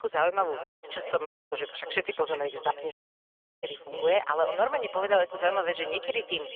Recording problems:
phone-call audio; poor line; nothing above 3.5 kHz
thin; very; fading below 400 Hz
echo of what is said; noticeable; throughout; 360 ms later, 10 dB below the speech
audio cutting out; at 0.5 s, at 1.5 s and at 3 s for 0.5 s

